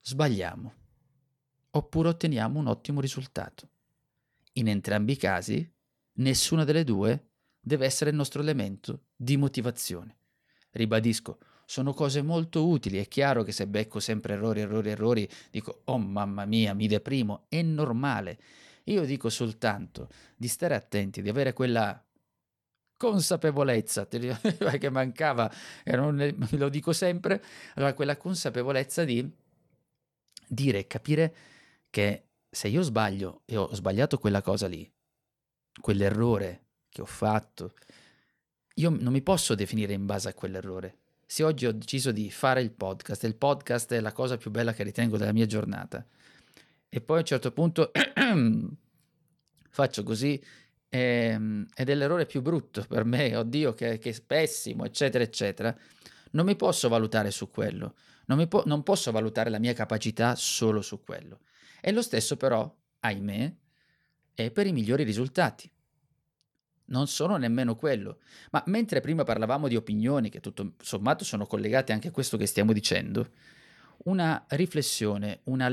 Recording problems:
abrupt cut into speech; at the end

